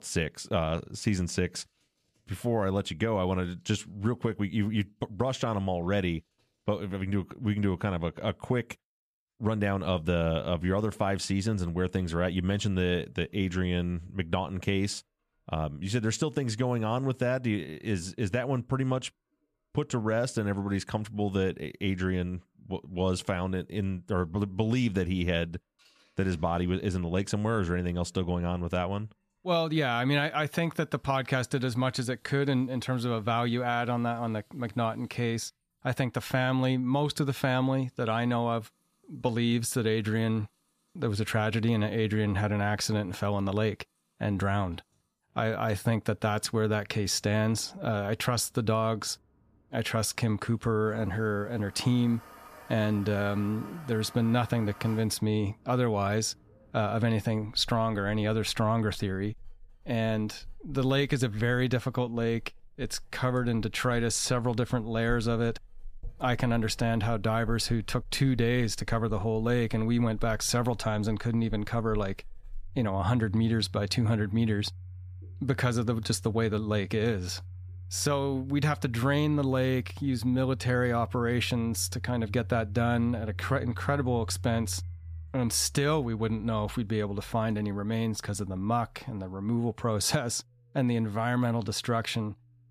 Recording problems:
household noises; noticeable; throughout; 15 dB below the speech

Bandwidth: 14.5 kHz